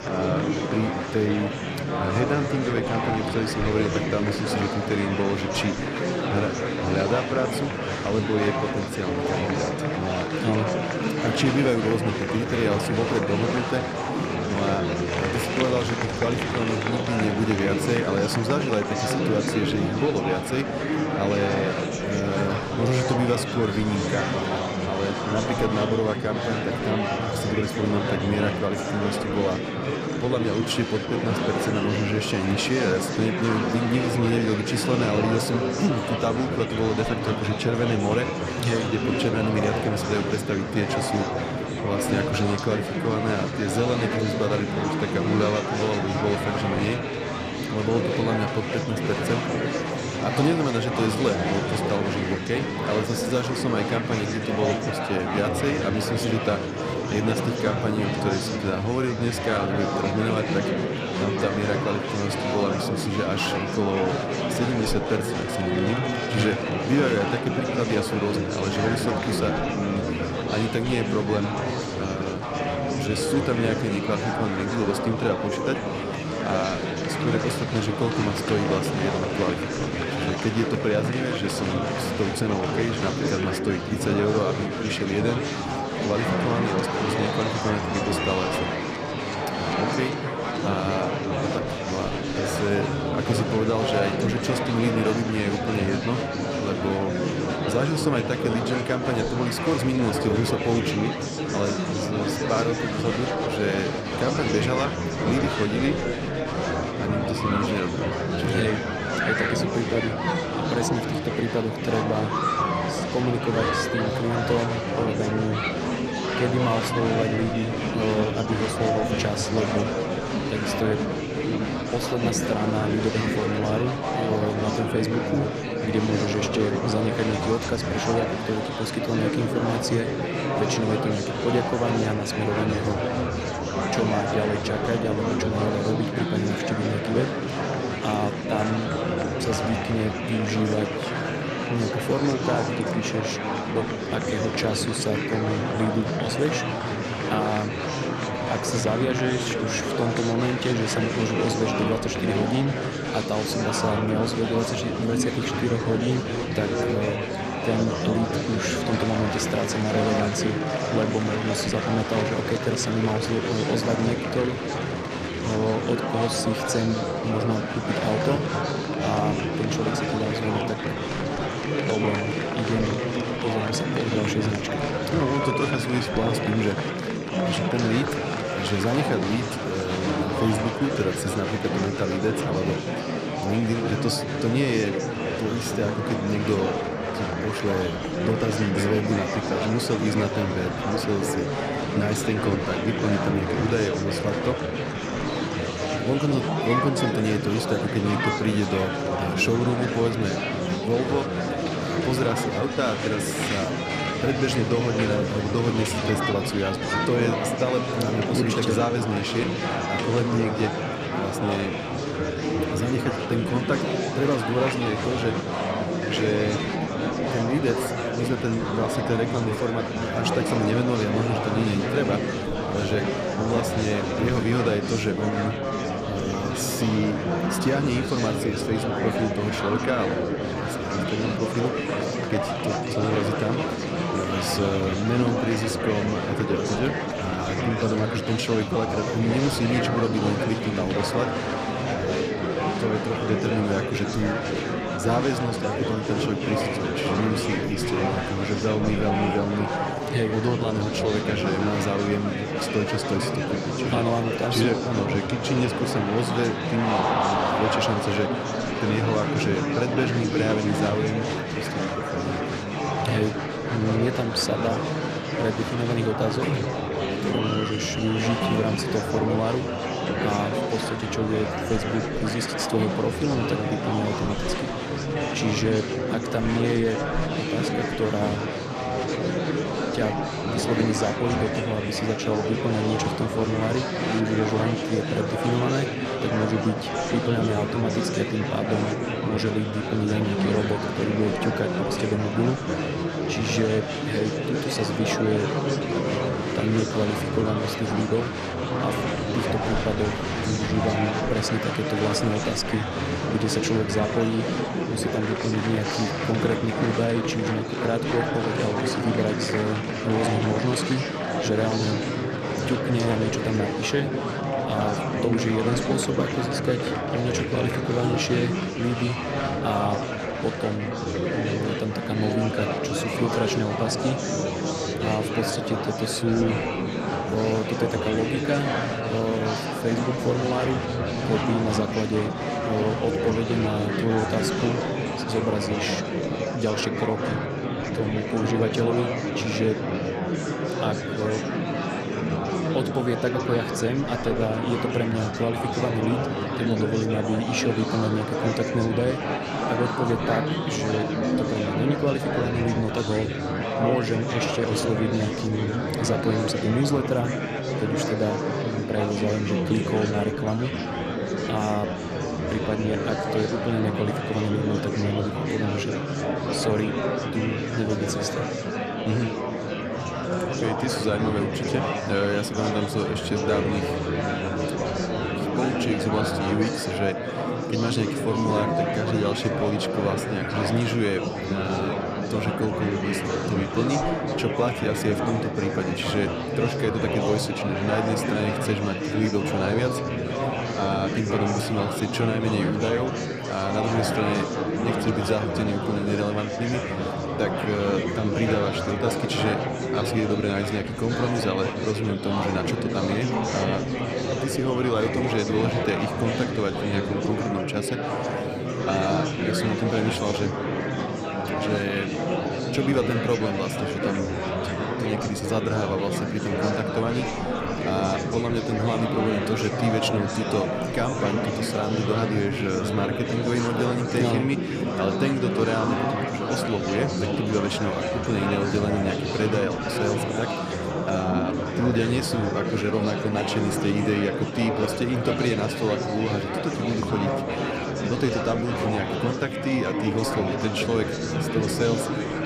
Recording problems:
murmuring crowd; very loud; throughout; as loud as the speech

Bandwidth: 14.5 kHz